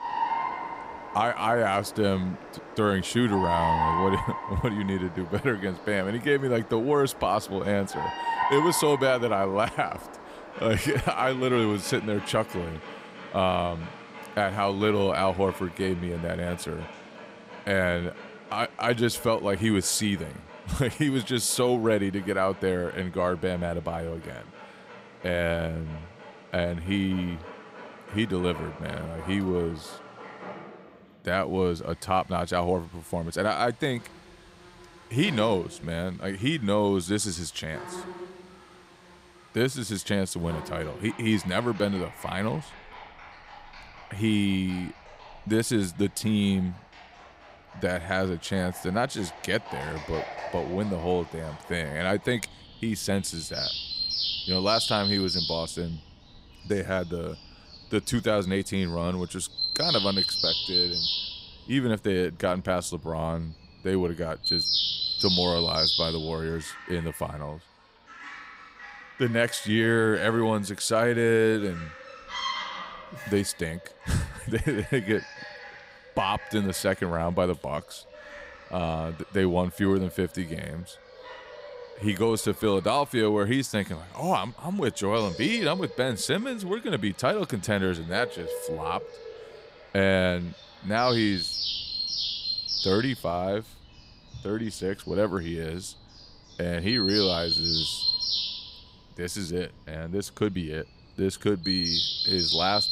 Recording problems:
animal sounds; loud; throughout; 3 dB below the speech

